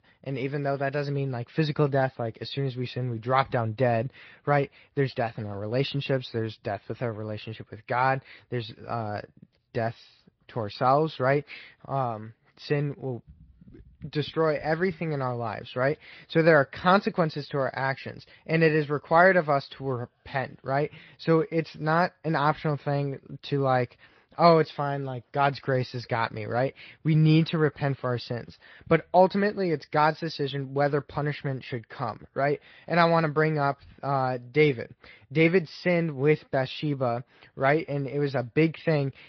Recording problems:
high frequencies cut off; noticeable; nothing above 5 kHz
garbled, watery; slightly

